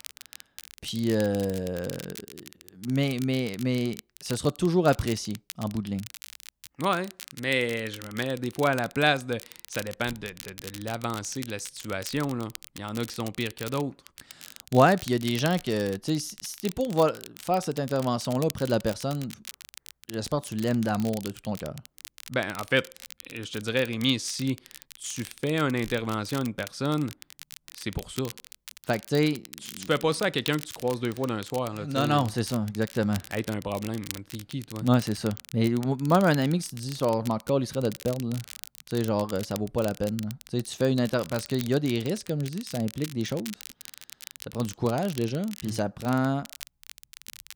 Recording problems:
crackle, like an old record; noticeable; 15 dB below the speech

